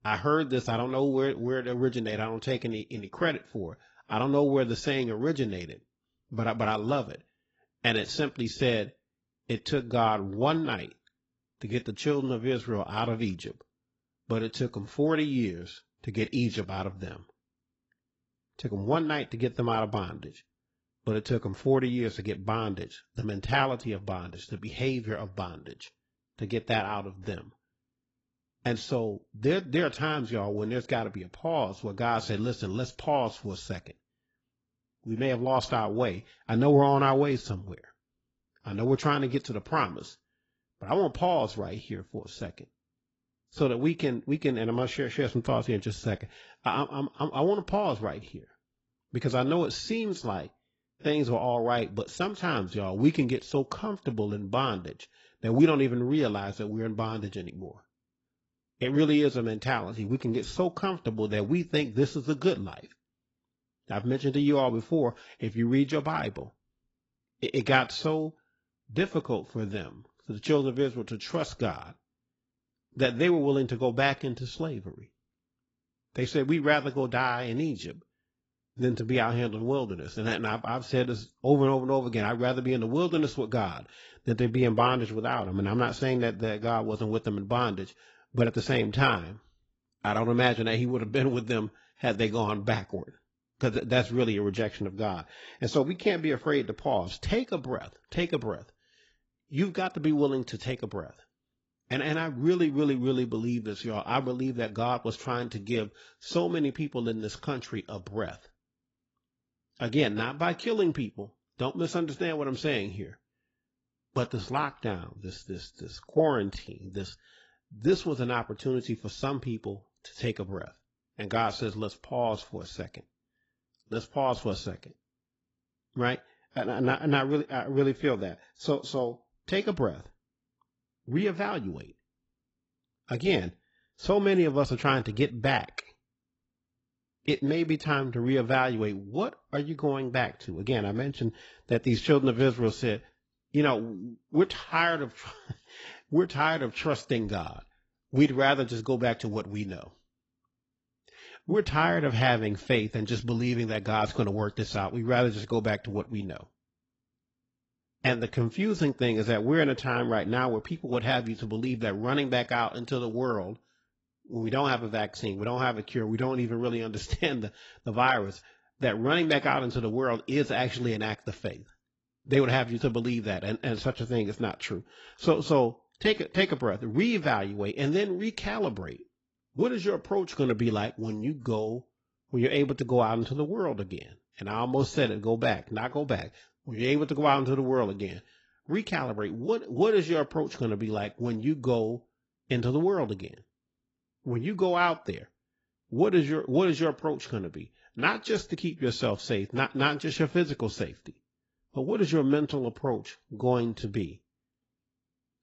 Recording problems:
garbled, watery; badly; nothing above 7.5 kHz

